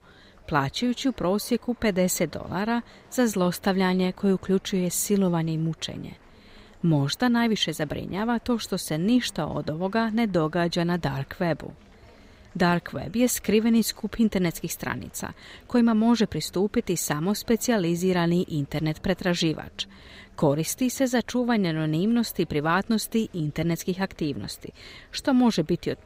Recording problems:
murmuring crowd; faint; throughout; 30 dB below the speech

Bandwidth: 15.5 kHz